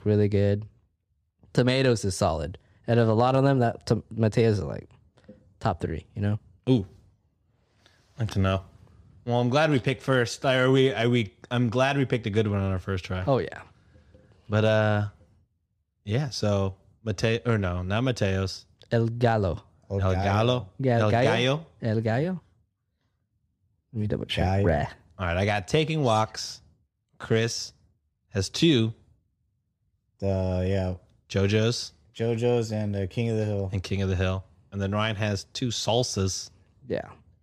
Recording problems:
none

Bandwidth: 14.5 kHz